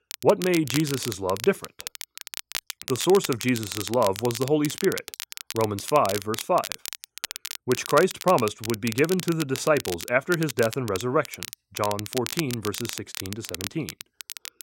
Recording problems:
crackle, like an old record; loud; 9 dB below the speech

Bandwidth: 16 kHz